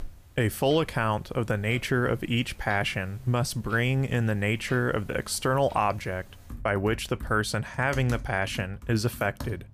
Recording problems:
household noises; noticeable; throughout; 20 dB below the speech

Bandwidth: 15 kHz